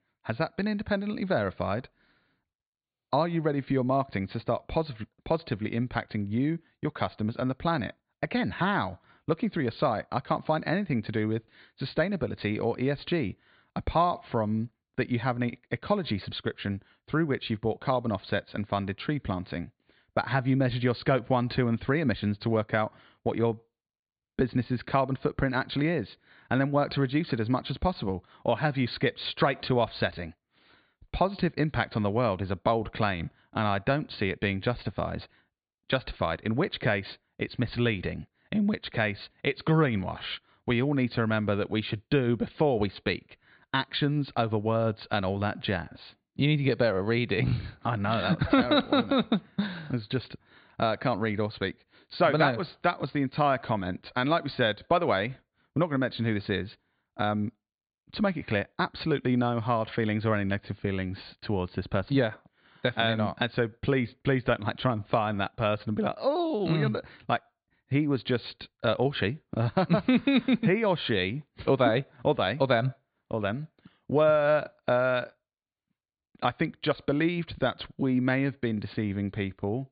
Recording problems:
high frequencies cut off; severe; nothing above 4.5 kHz

